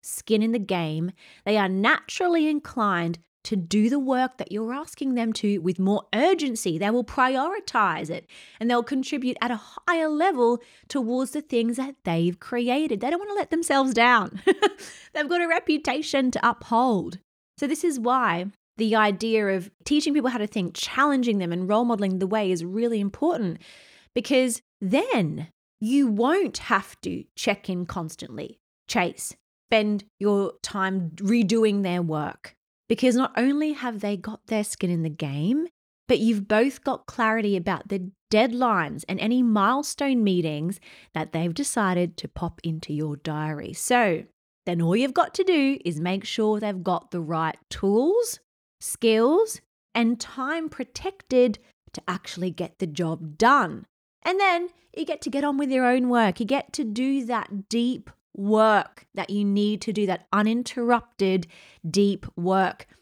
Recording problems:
none

